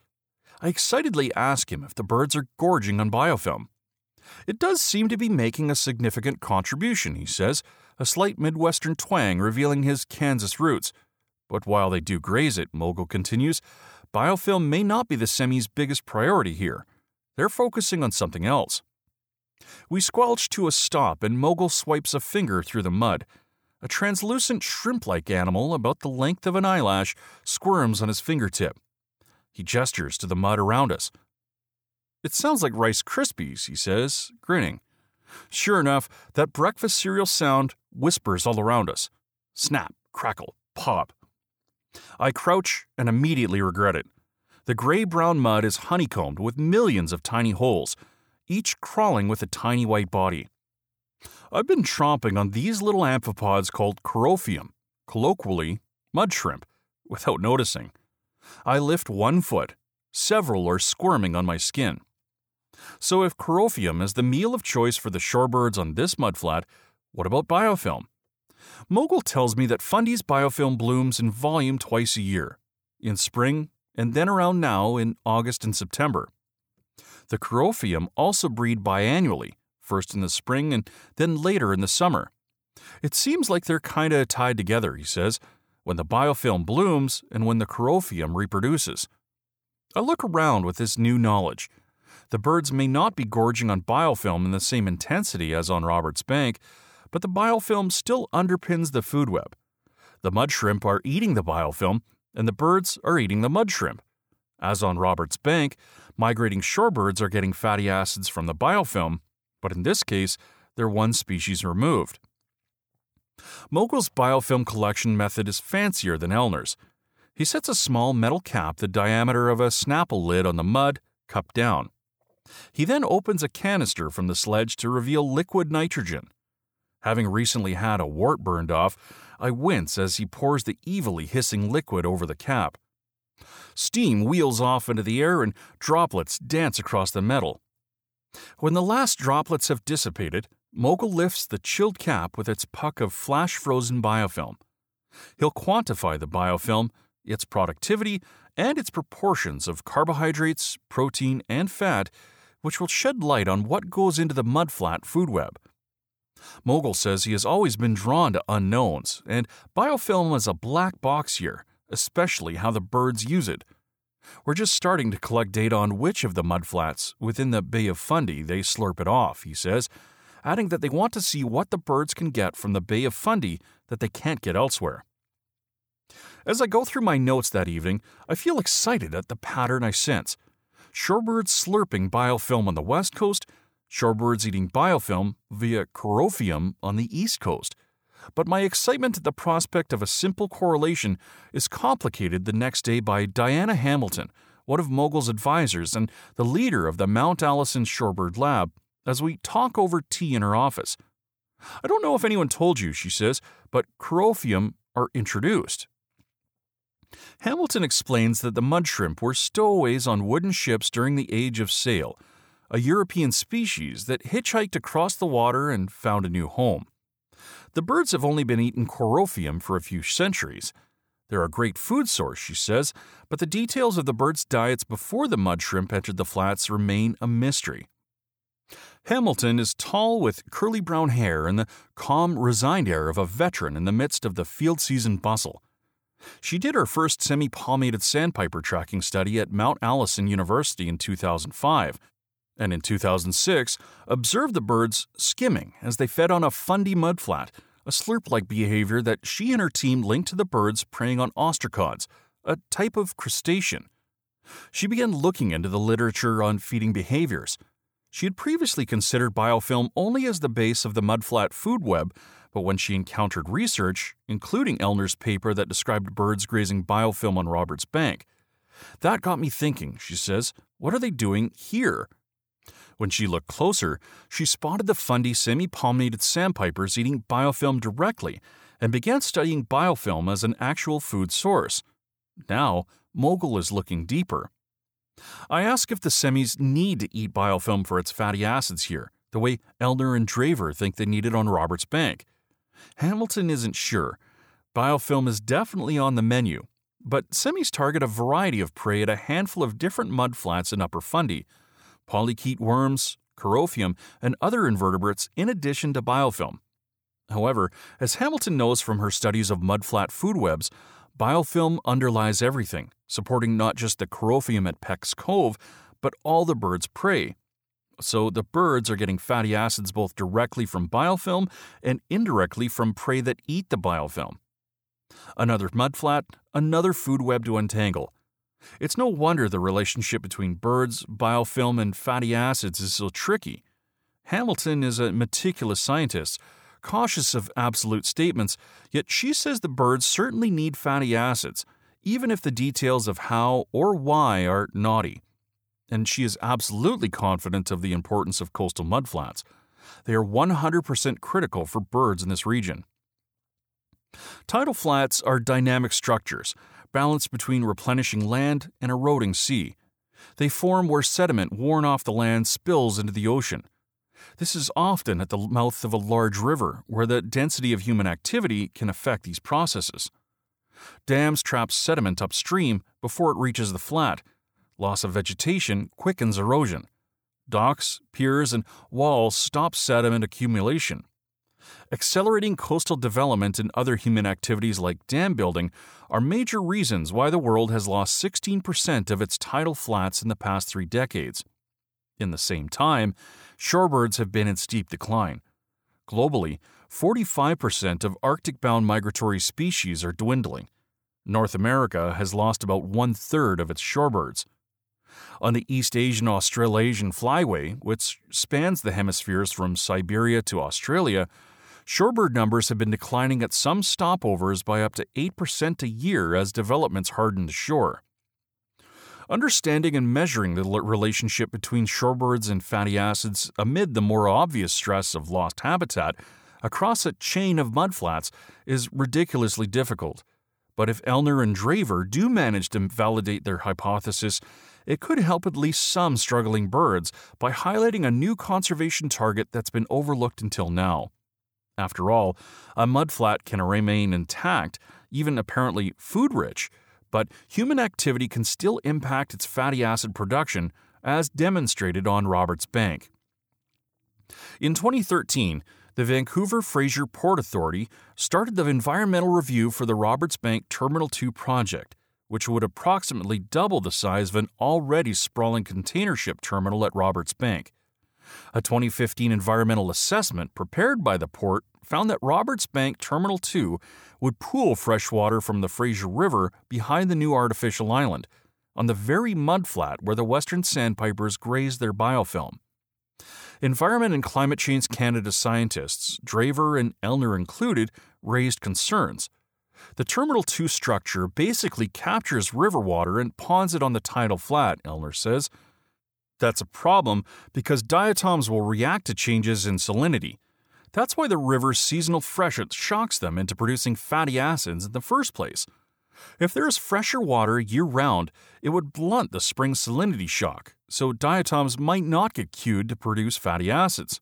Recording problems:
none

